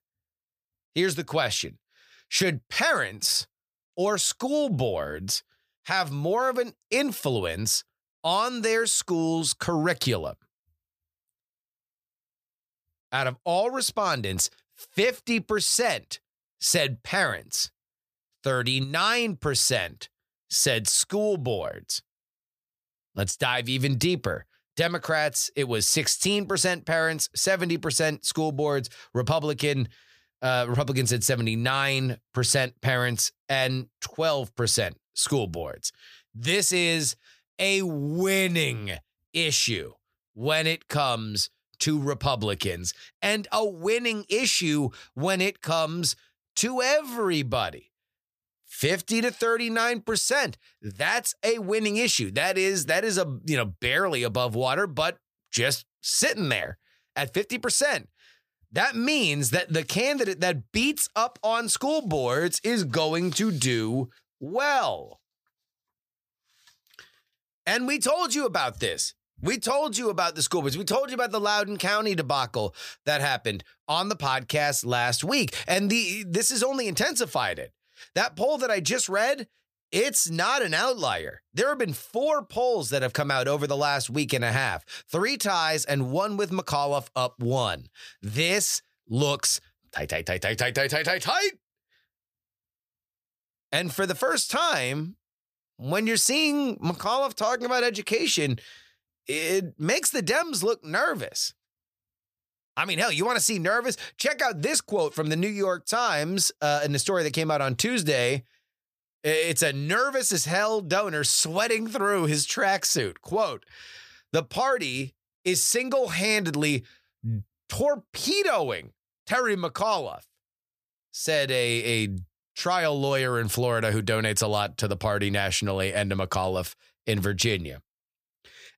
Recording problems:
none

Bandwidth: 15 kHz